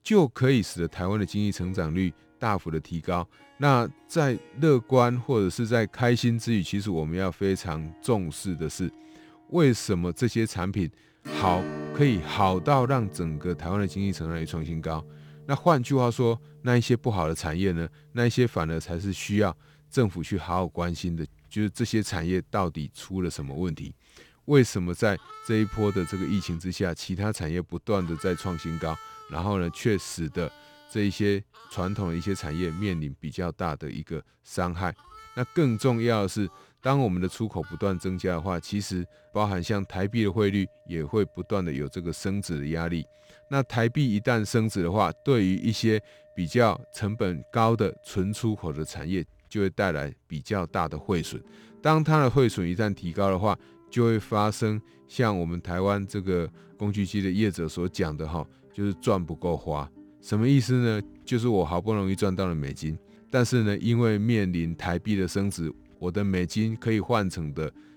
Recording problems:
background music; faint; throughout; 20 dB below the speech

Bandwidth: 18.5 kHz